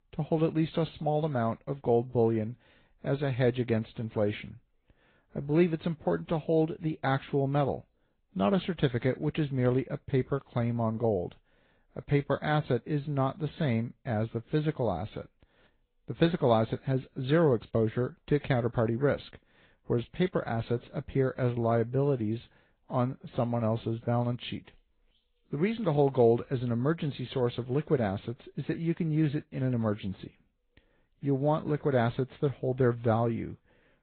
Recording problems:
high frequencies cut off; severe; nothing above 4 kHz
garbled, watery; slightly

